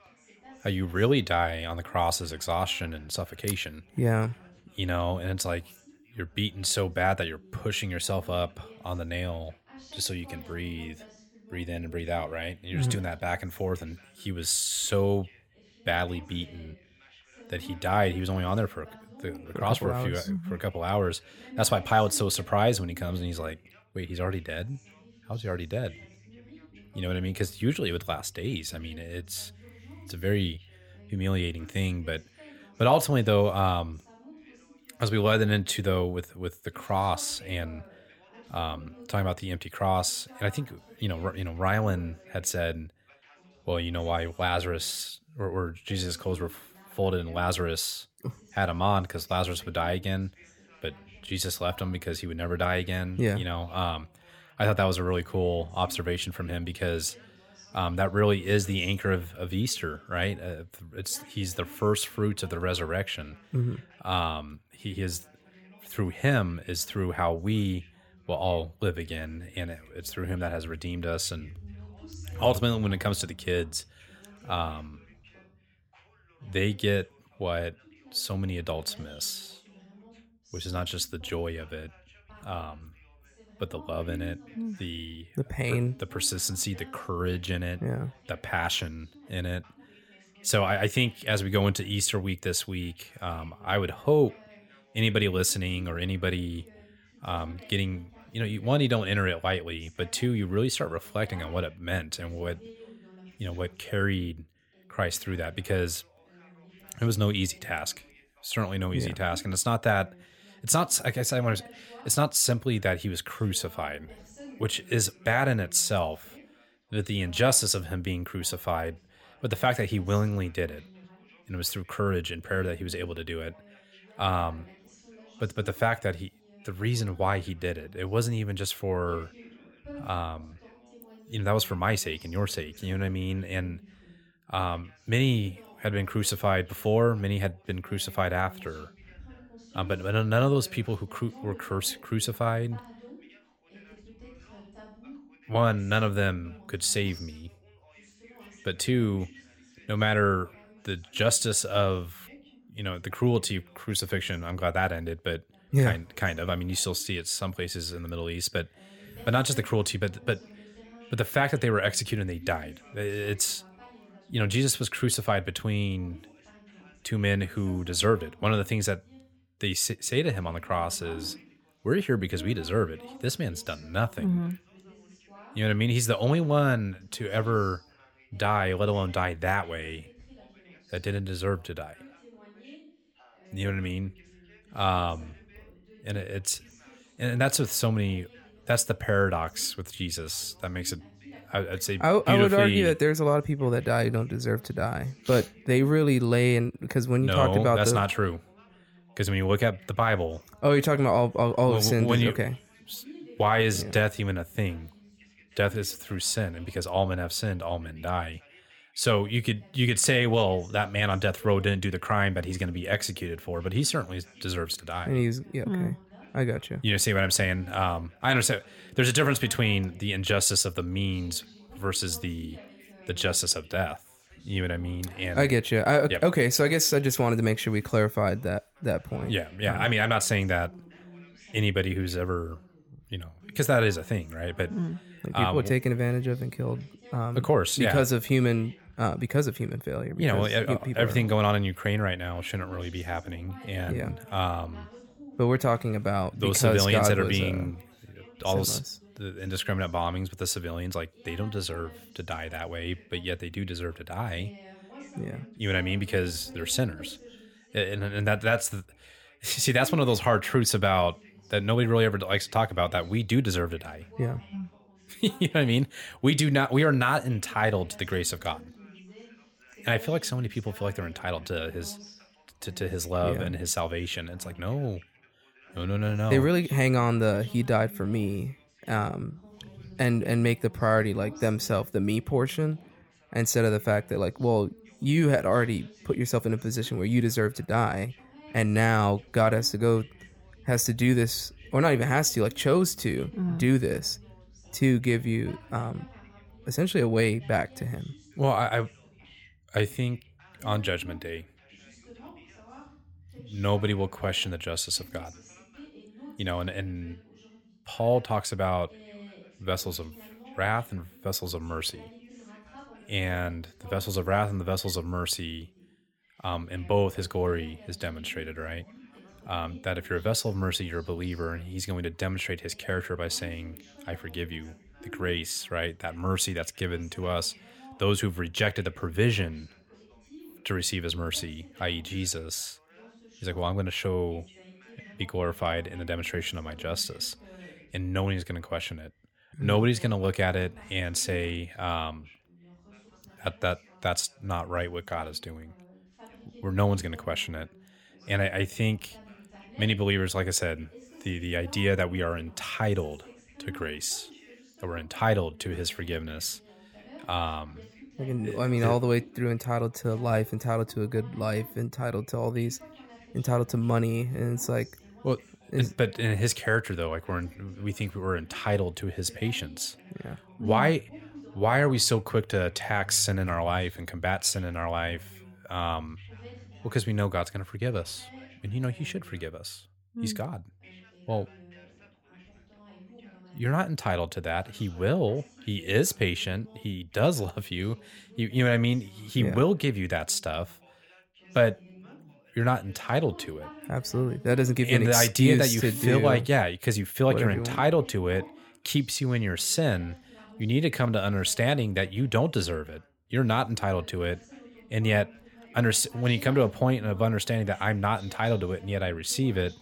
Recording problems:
background chatter; faint; throughout; 2 voices, 25 dB below the speech

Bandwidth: 18.5 kHz